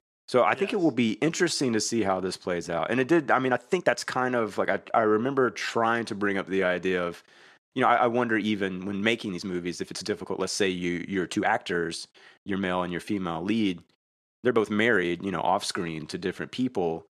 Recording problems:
uneven, jittery; strongly; from 1.5 to 16 s

